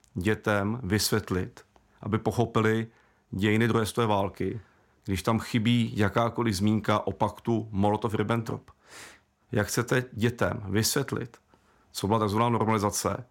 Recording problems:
none

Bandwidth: 16.5 kHz